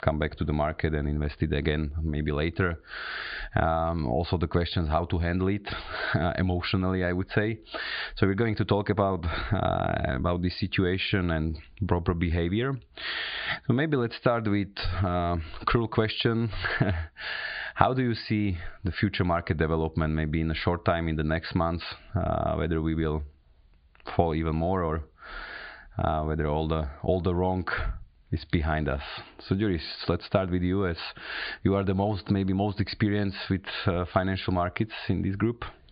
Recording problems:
high frequencies cut off; severe; nothing above 4.5 kHz
squashed, flat; heavily

